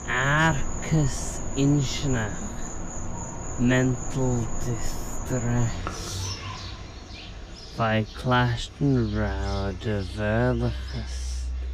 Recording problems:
wrong speed, natural pitch; too slow; 0.5 times normal speed
animal sounds; loud; throughout; 9 dB below the speech

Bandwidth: 15 kHz